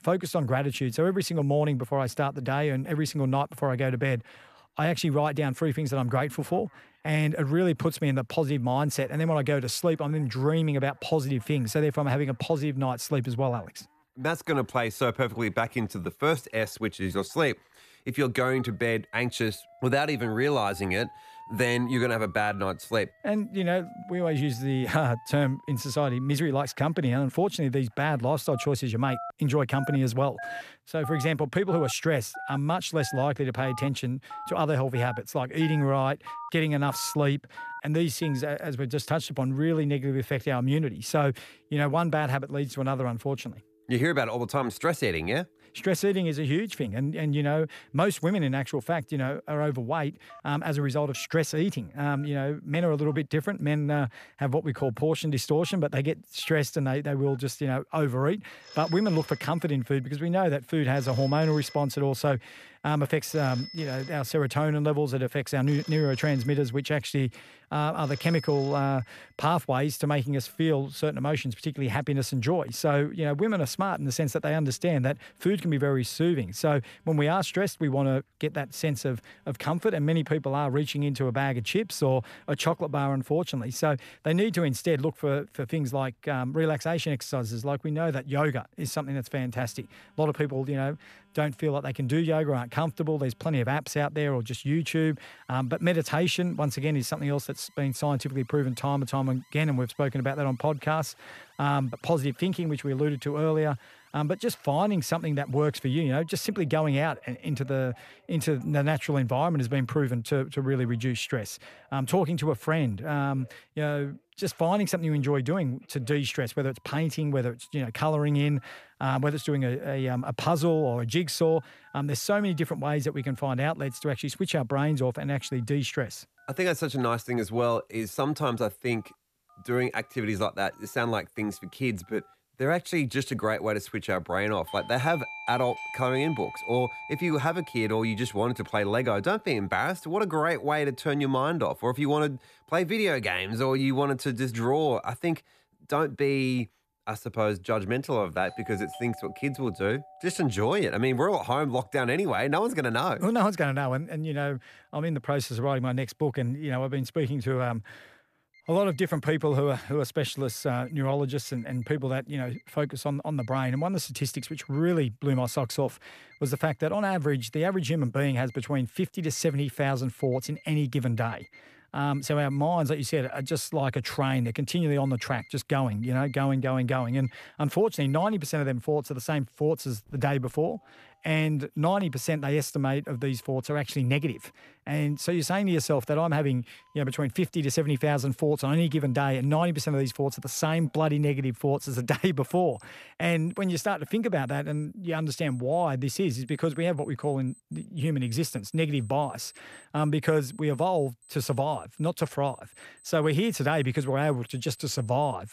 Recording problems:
alarms or sirens; noticeable; throughout; 20 dB below the speech

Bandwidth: 14.5 kHz